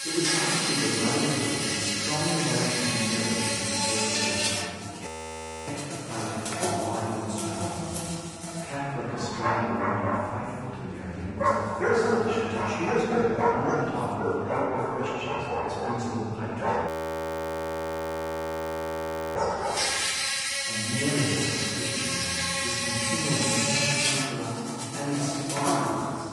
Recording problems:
room echo; strong; dies away in 2.5 s
off-mic speech; far
garbled, watery; slightly
animal sounds; very loud; throughout; 4 dB above the speech
voice in the background; faint; throughout; 25 dB below the speech
audio freezing; at 5 s for 0.5 s and at 17 s for 2.5 s

